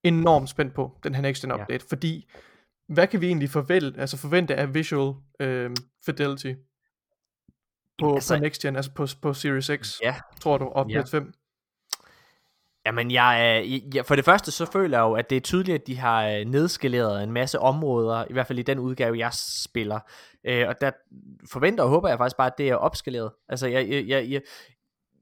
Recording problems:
none

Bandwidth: 17.5 kHz